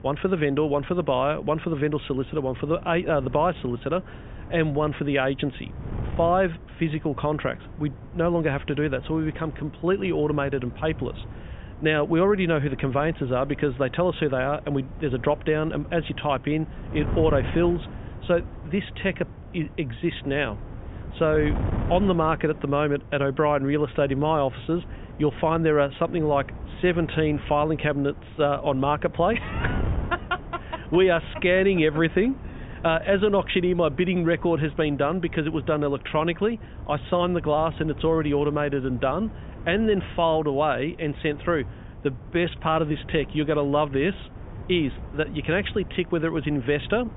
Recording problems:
high frequencies cut off; severe; nothing above 4 kHz
muffled; very slightly; fading above 3.5 kHz
wind noise on the microphone; occasional gusts; 20 dB below the speech

